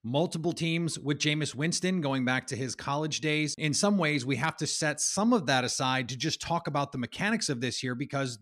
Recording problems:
none

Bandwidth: 14.5 kHz